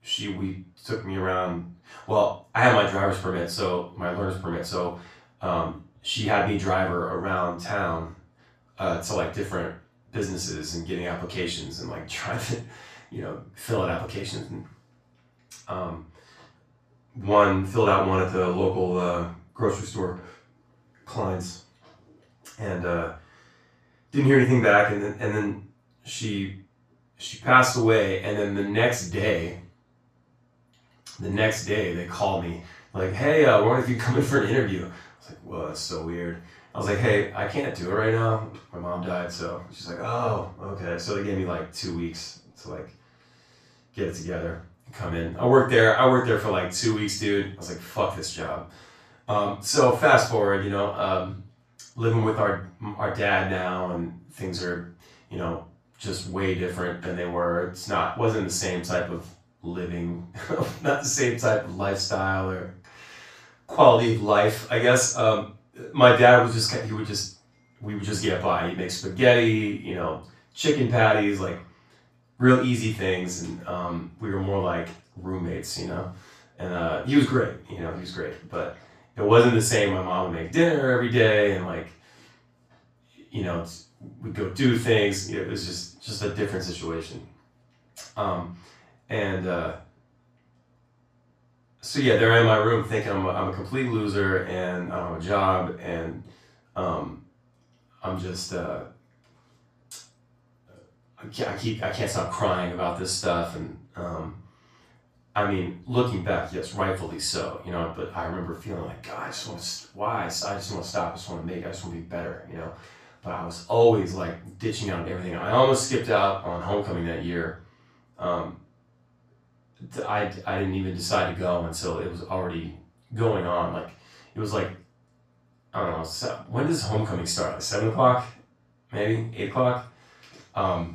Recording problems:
off-mic speech; far
room echo; noticeable; dies away in 0.3 s

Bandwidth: 14.5 kHz